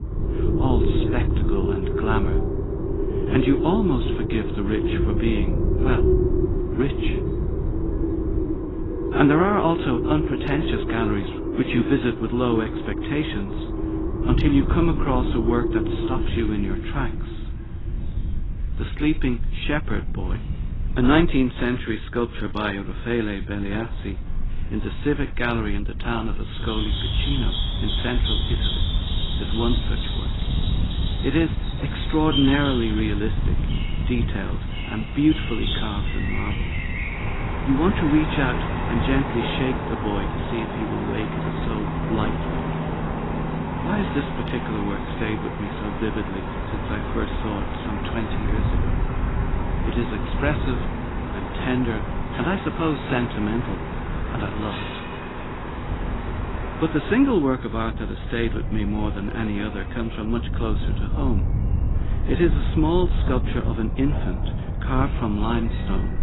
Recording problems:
garbled, watery; badly; nothing above 4 kHz
animal sounds; loud; throughout; 4 dB below the speech
wind noise on the microphone; occasional gusts; 15 dB below the speech

